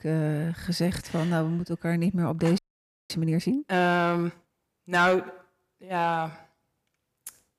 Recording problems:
distortion; slight; 10 dB below the speech
audio freezing; at 2.5 s for 0.5 s

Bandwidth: 15 kHz